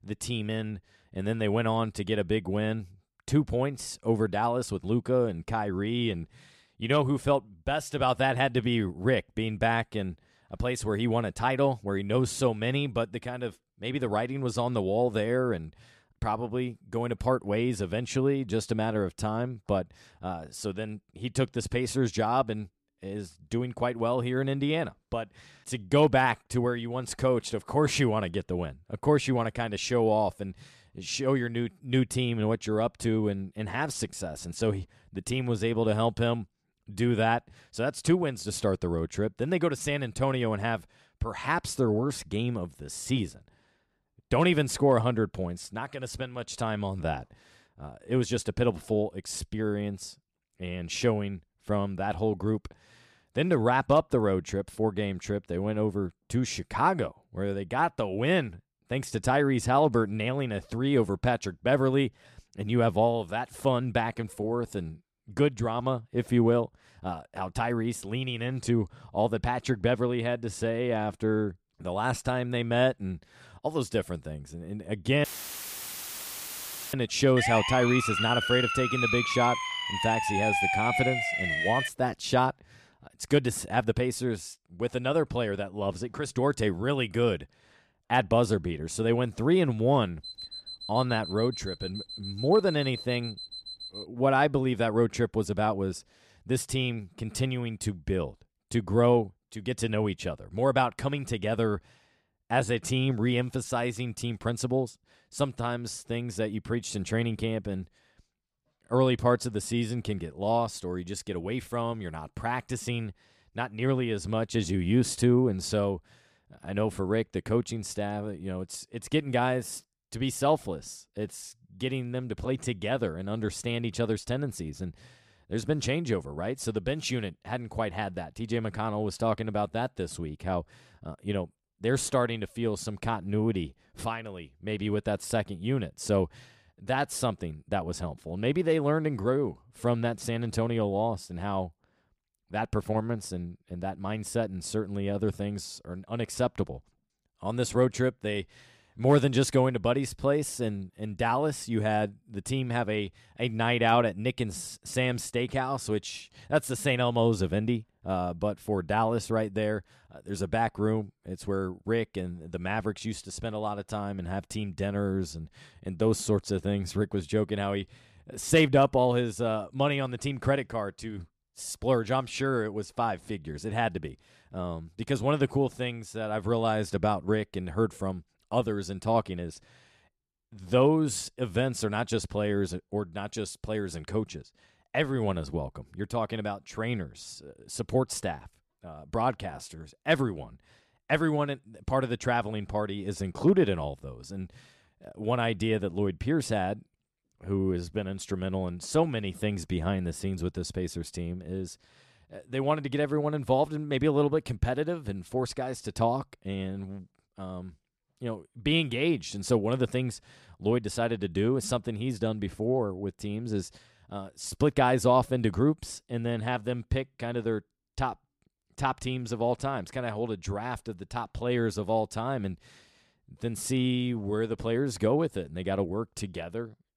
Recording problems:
audio cutting out; filled with static; at 1:15 for 1.5 s
siren; loud; from 1:17 to 1:22; peak 4 dB above the speech
alarm; noticeable; from 1:30 to 1:34; peak 9 dB below the speech

